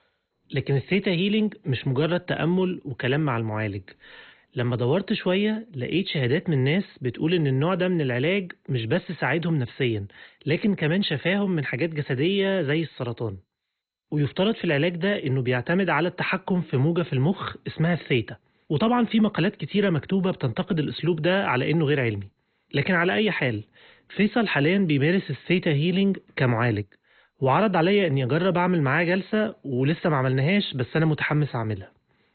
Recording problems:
garbled, watery; badly; nothing above 4 kHz

